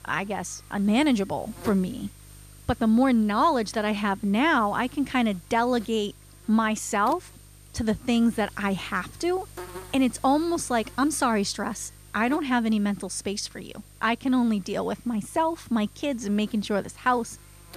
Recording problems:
electrical hum; faint; throughout; 50 Hz, 25 dB below the speech

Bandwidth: 14.5 kHz